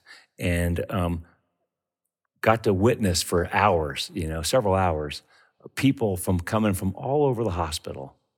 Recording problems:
none

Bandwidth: 17.5 kHz